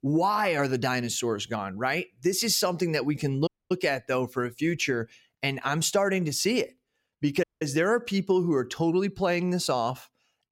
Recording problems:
audio cutting out; at 3.5 s and at 7.5 s

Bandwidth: 16.5 kHz